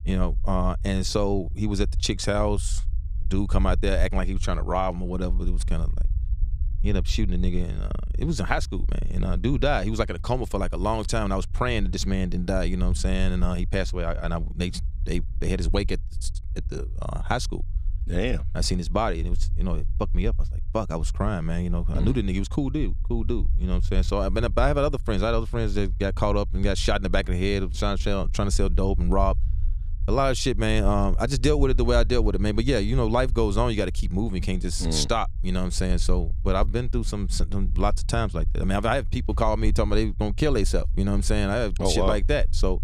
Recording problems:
low rumble; faint; throughout; 25 dB below the speech

